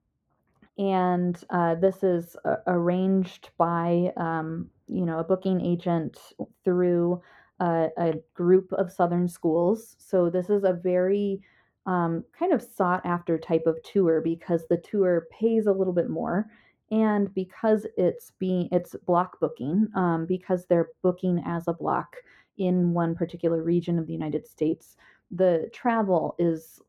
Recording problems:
muffled; very; fading above 2.5 kHz

